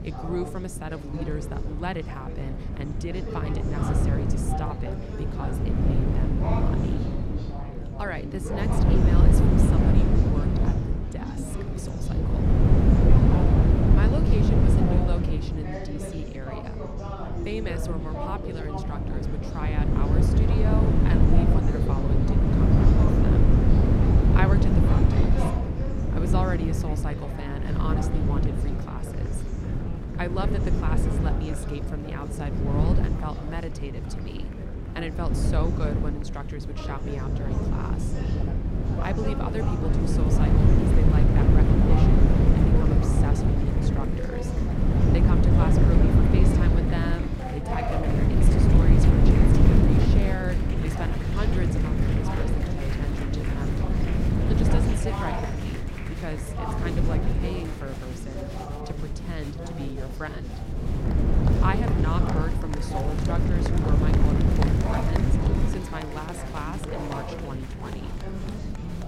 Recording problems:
wind noise on the microphone; heavy; 3 dB above the speech
chatter from many people; loud; throughout; 3 dB below the speech

